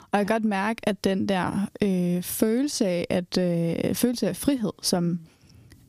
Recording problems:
squashed, flat; heavily

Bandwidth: 15 kHz